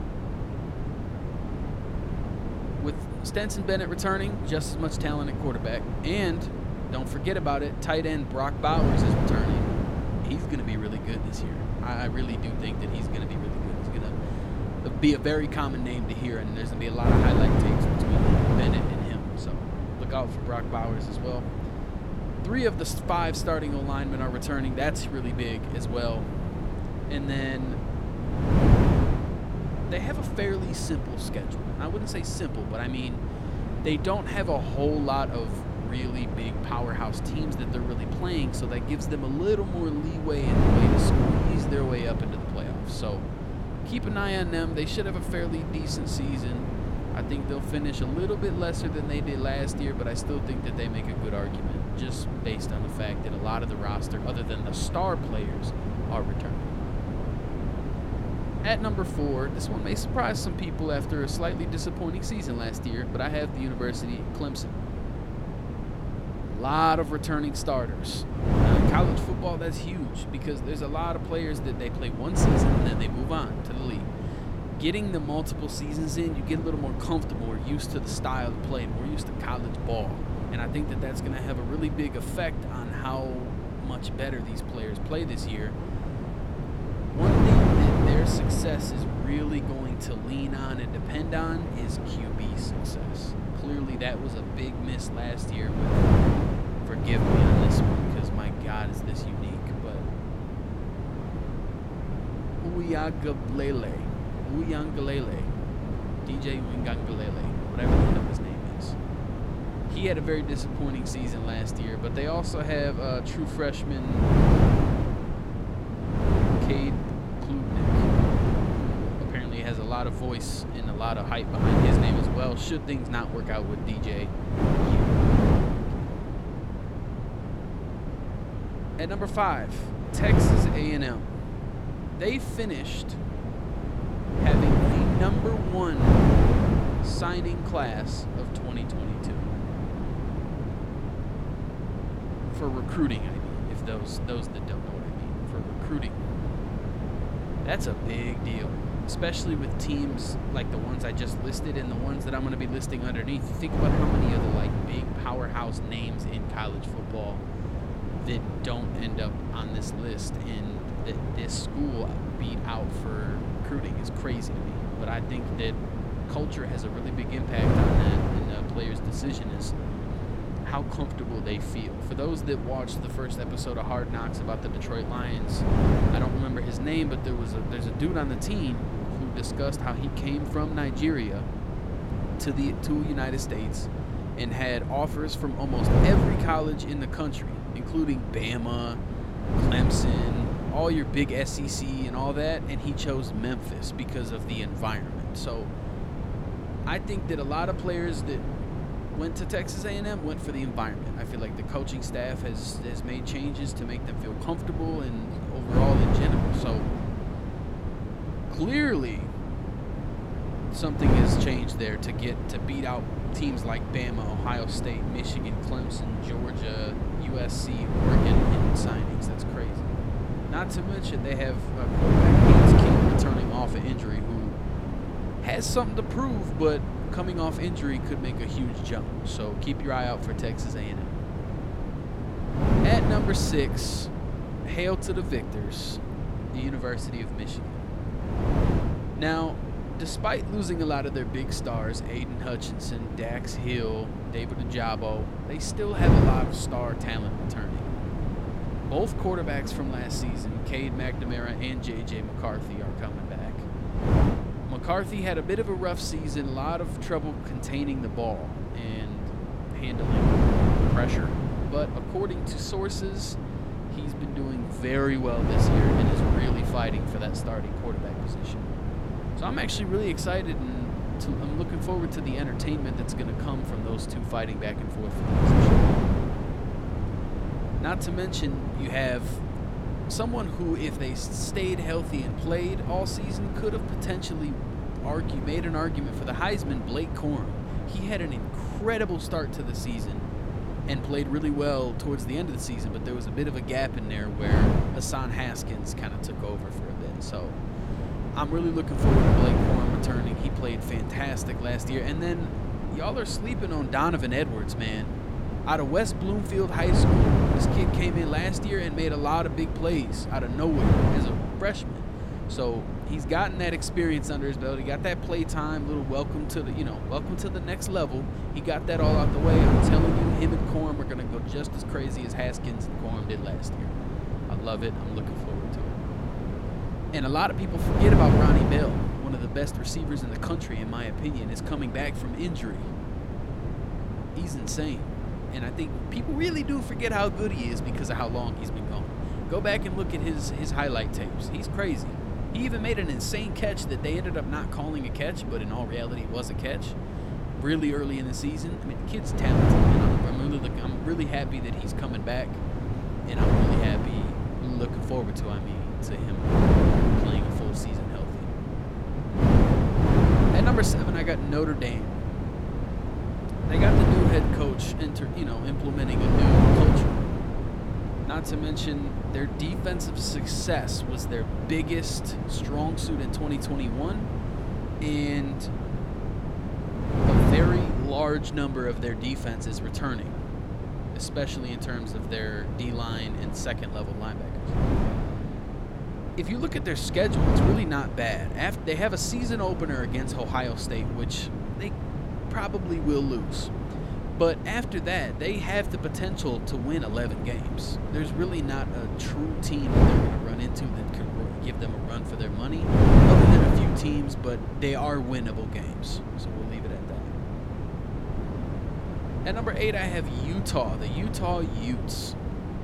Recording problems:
wind noise on the microphone; heavy; 2 dB below the speech

